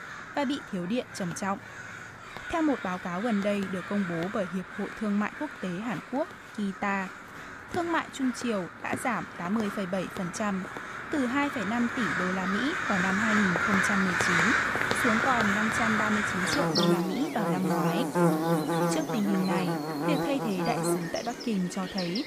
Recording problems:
animal sounds; very loud; throughout; 1 dB above the speech

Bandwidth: 15 kHz